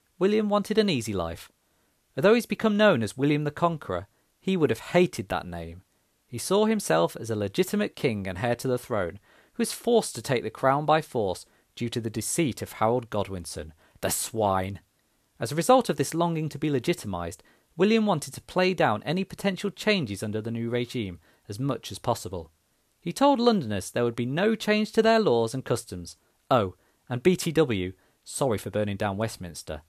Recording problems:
none

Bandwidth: 14 kHz